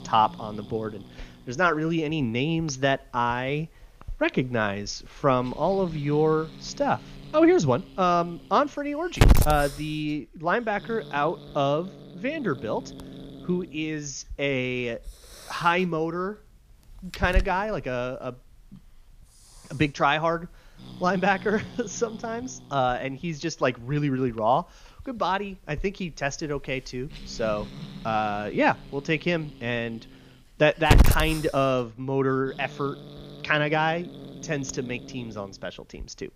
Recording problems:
high frequencies cut off; noticeable; nothing above 6.5 kHz
hiss; loud; throughout; 5 dB below the speech

